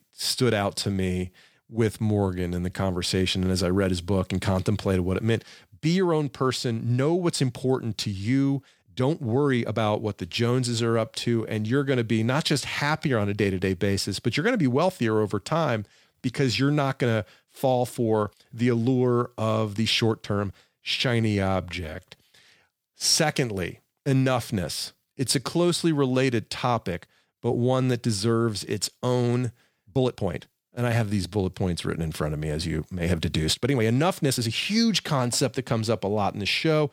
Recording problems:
uneven, jittery; strongly; from 1 to 34 s

